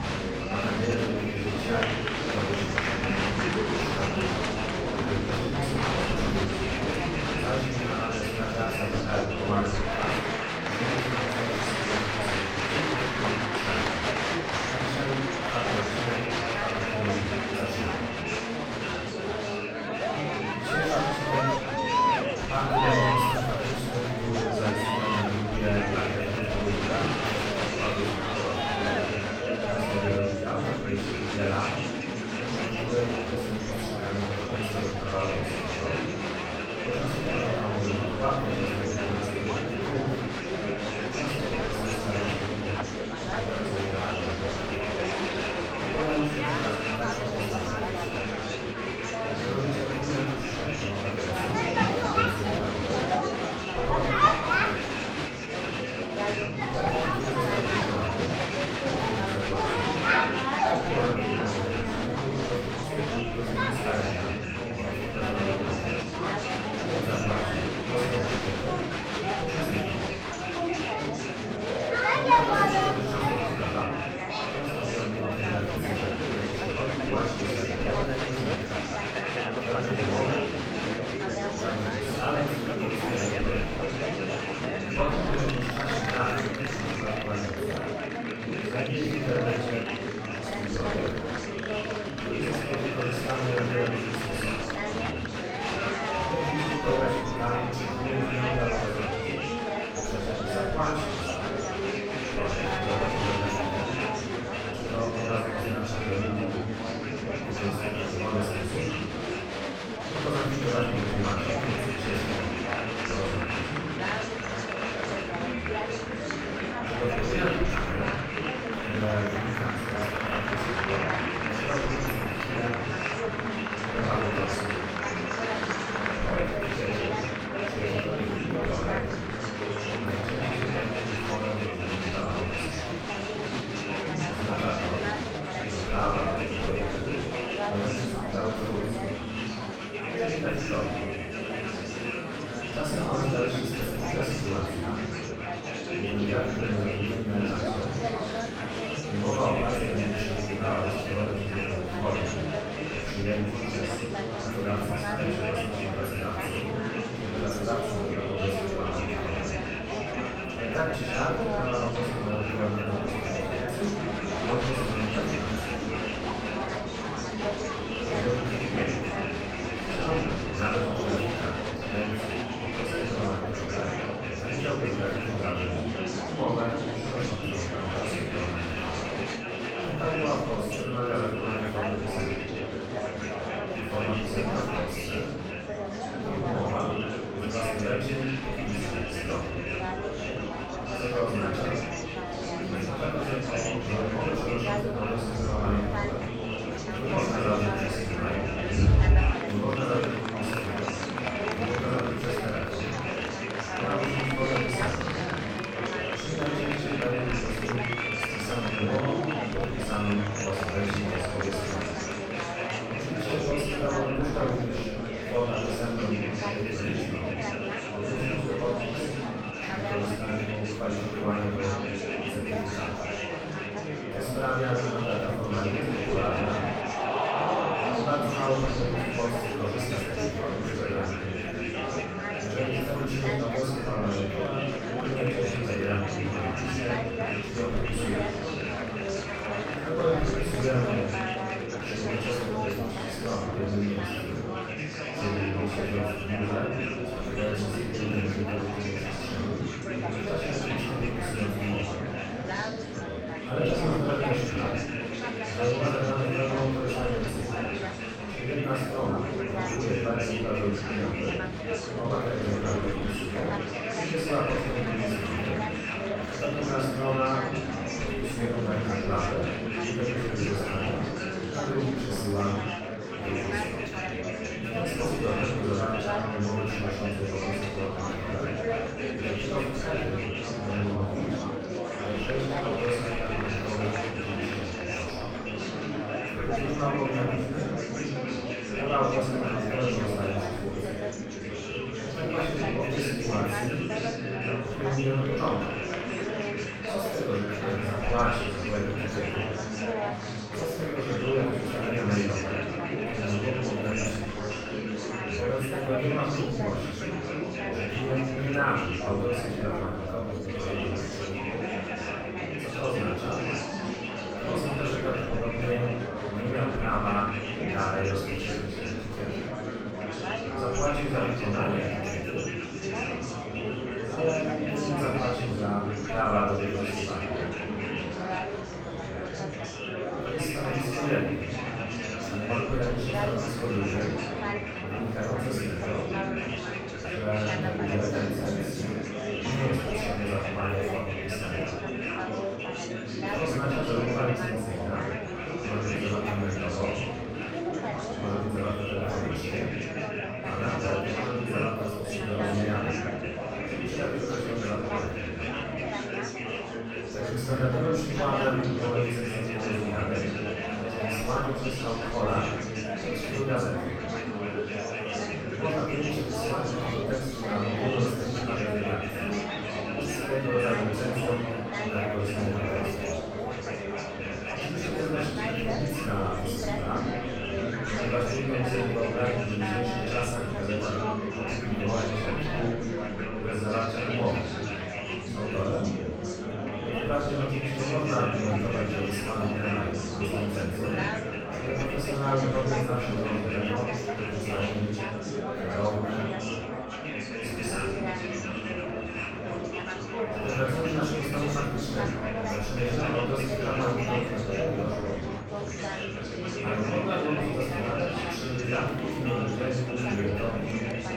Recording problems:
room echo; strong; dies away in 1.1 s
off-mic speech; far
murmuring crowd; very loud; throughout; 1 dB above the speech
background music; faint; throughout; 25 dB below the speech

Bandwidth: 17 kHz